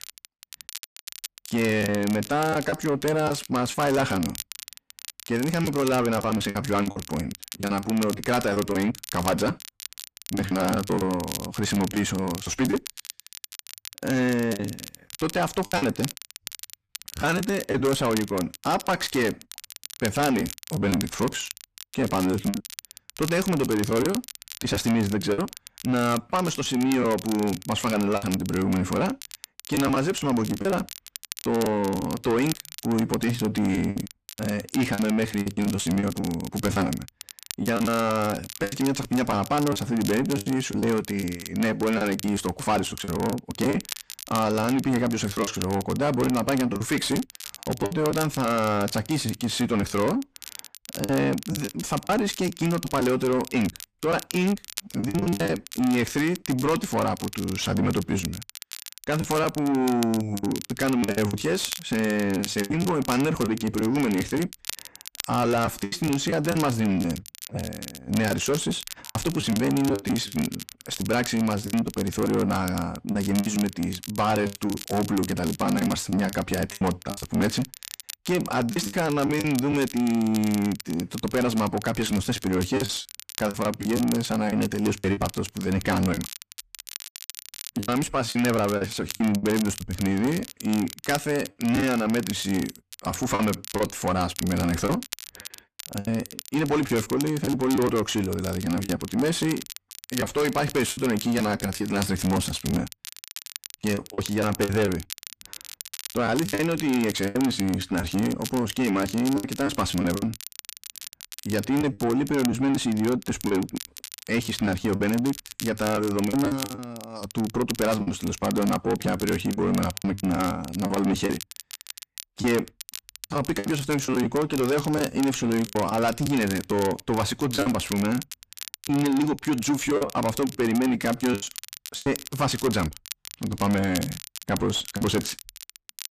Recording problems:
distortion; heavy; 7 dB below the speech
crackle, like an old record; noticeable; 15 dB below the speech
choppy; very; 8% of the speech affected

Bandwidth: 14.5 kHz